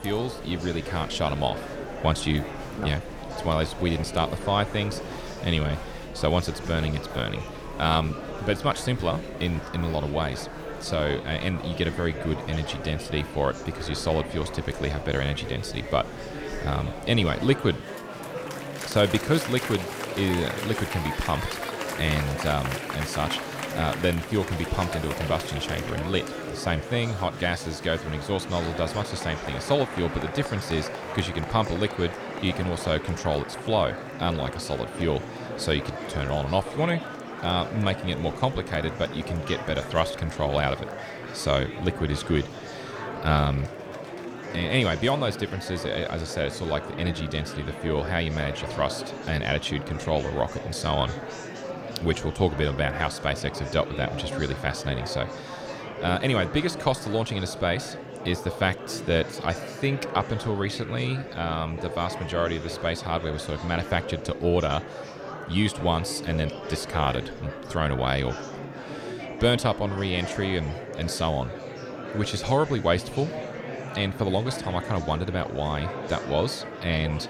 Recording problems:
murmuring crowd; loud; throughout; 8 dB below the speech

